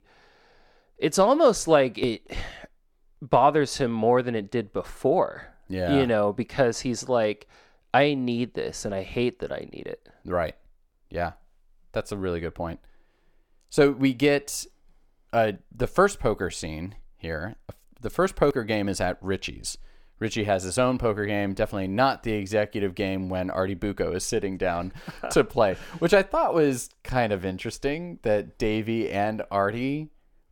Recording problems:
none

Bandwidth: 17.5 kHz